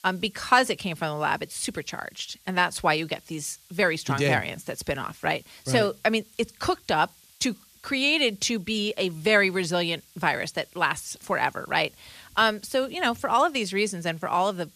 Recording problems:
hiss; faint; throughout; 25 dB below the speech

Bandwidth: 14.5 kHz